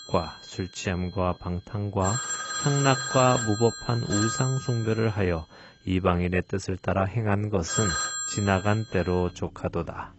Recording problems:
garbled, watery; badly; nothing above 8 kHz
alarms or sirens; loud; throughout; 4 dB below the speech

